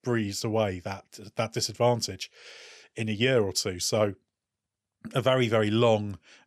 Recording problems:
none

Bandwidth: 13.5 kHz